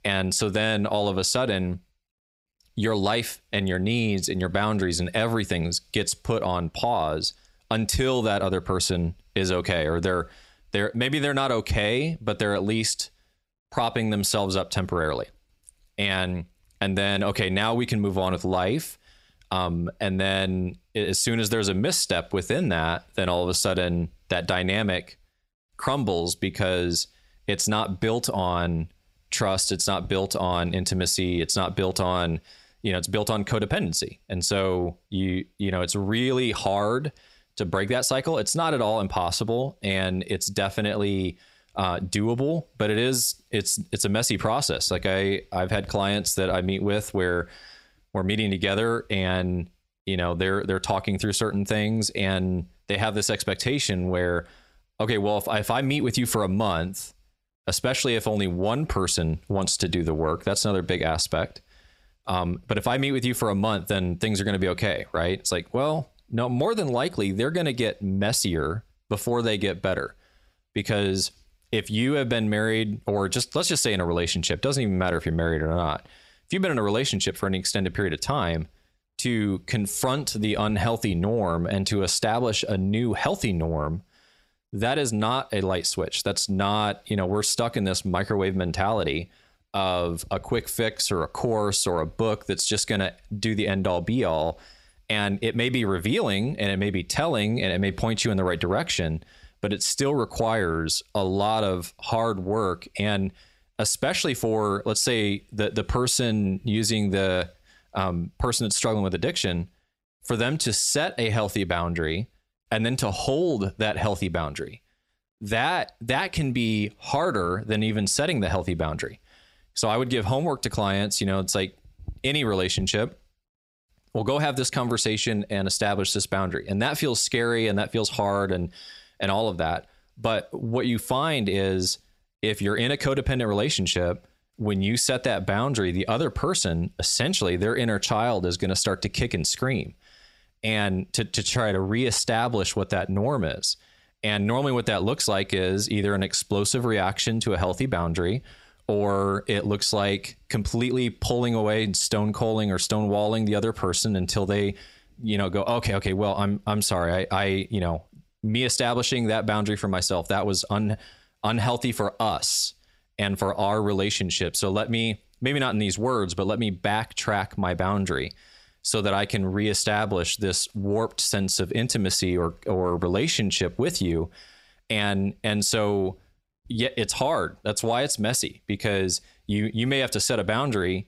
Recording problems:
squashed, flat; heavily

